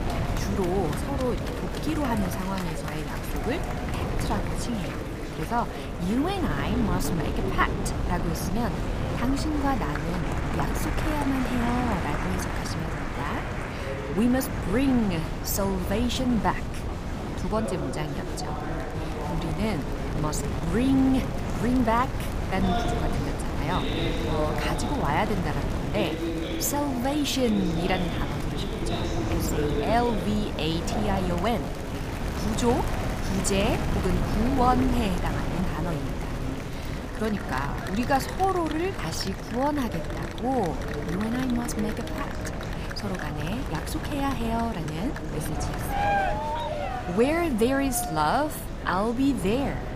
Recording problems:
wind noise on the microphone; heavy; 8 dB below the speech
murmuring crowd; loud; throughout; 6 dB below the speech

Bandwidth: 15 kHz